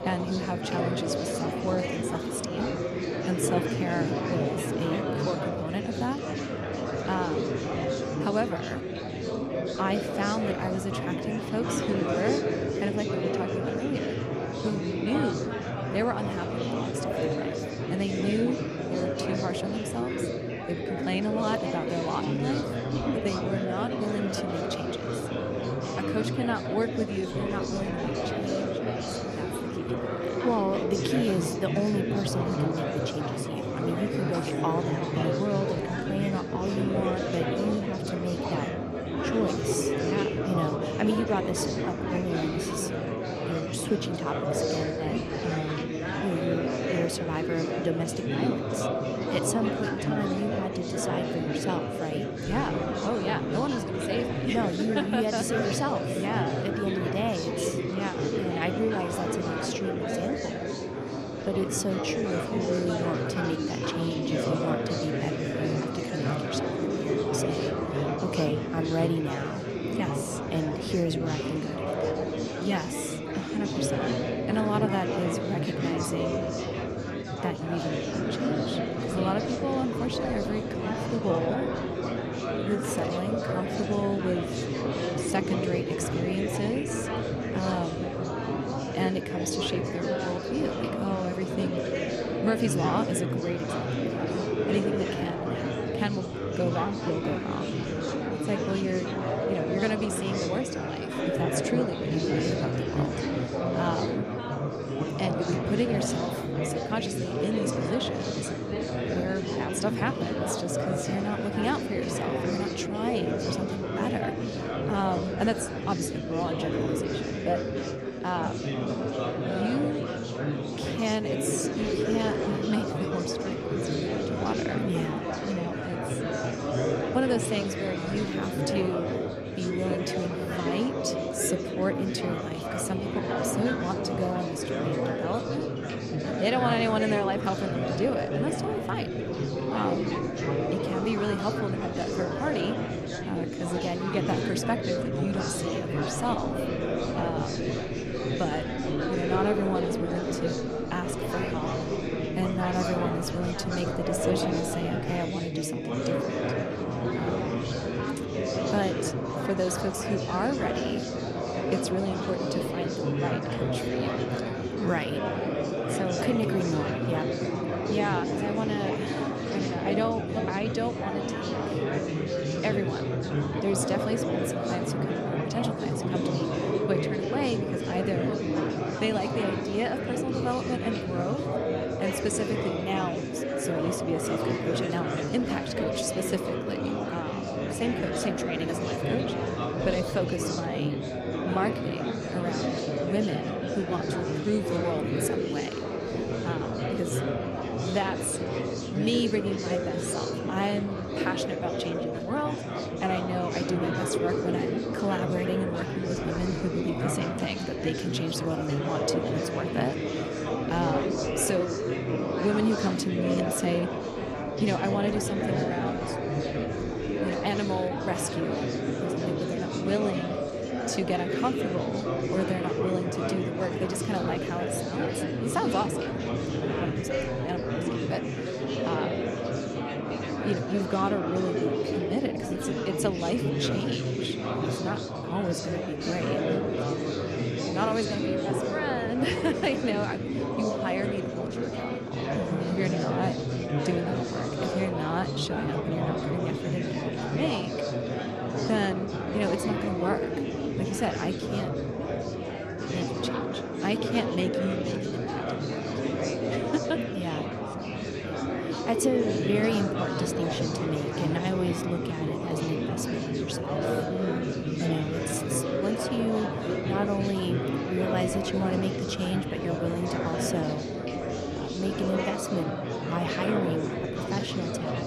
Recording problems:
chatter from many people; very loud; throughout; 2 dB above the speech

